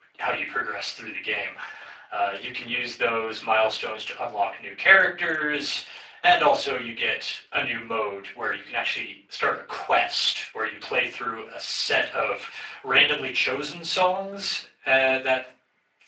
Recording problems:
off-mic speech; far
thin; very; fading below 800 Hz
room echo; slight; dies away in 0.3 s
garbled, watery; slightly; nothing above 7.5 kHz

